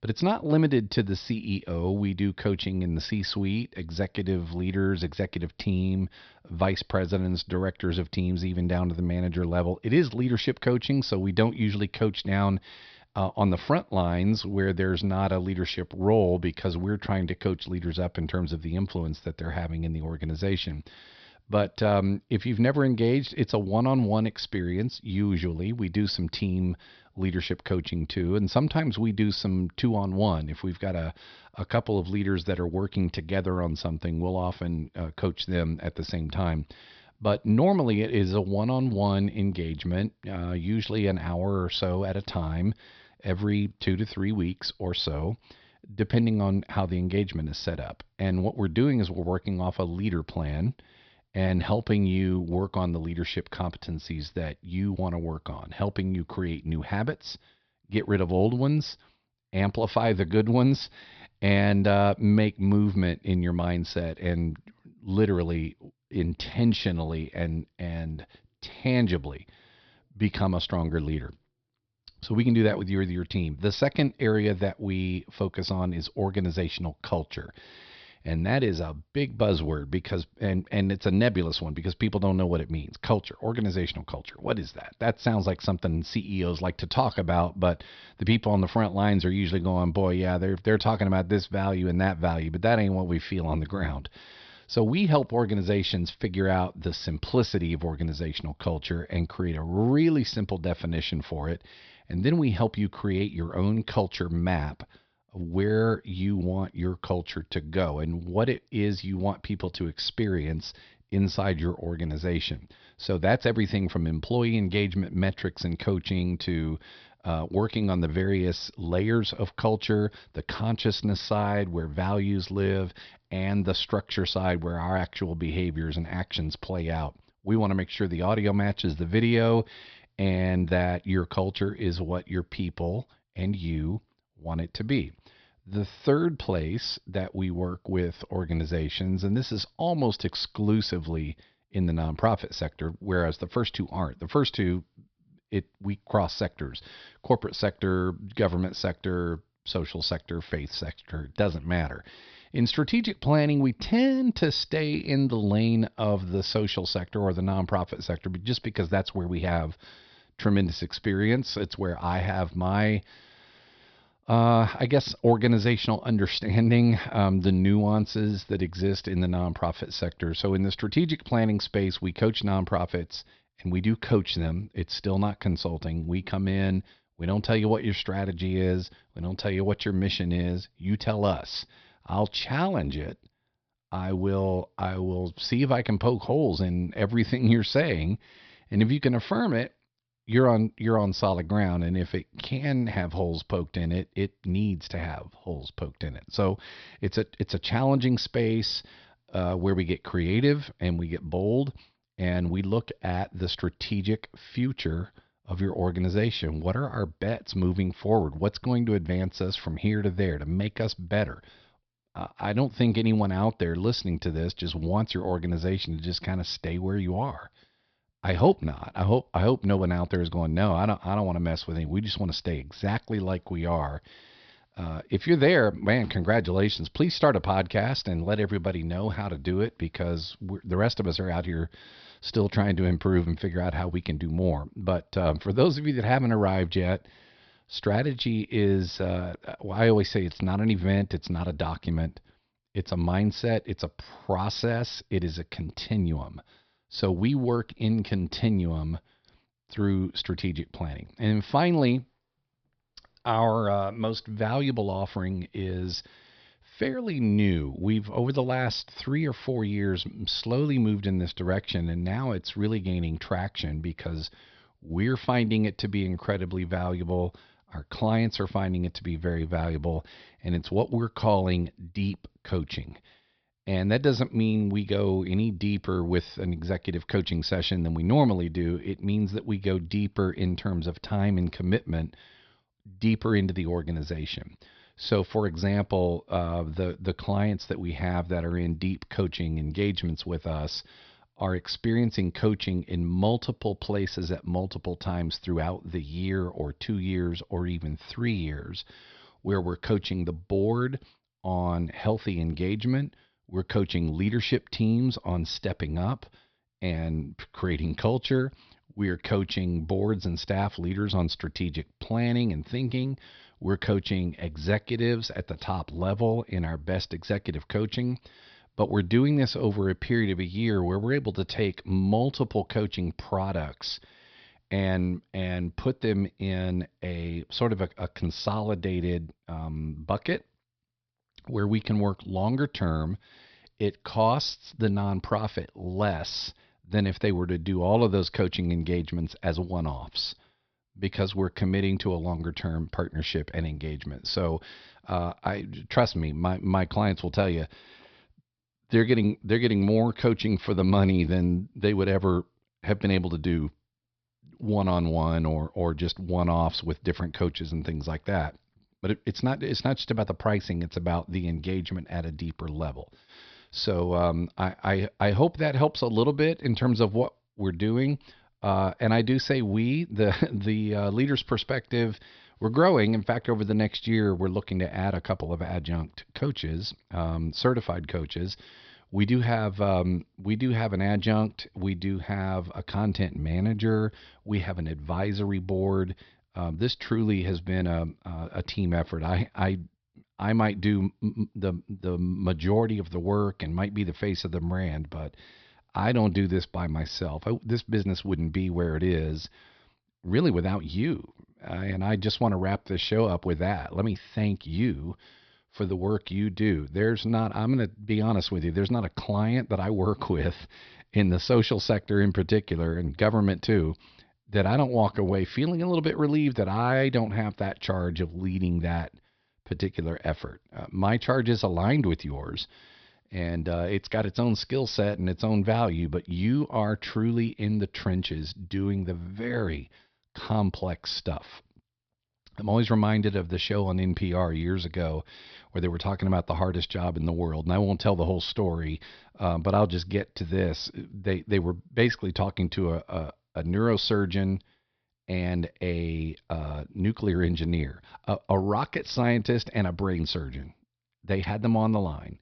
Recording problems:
high frequencies cut off; noticeable; nothing above 5.5 kHz

